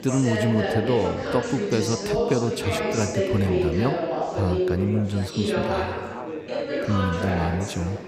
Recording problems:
chatter from many people; loud; throughout; as loud as the speech

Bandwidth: 15.5 kHz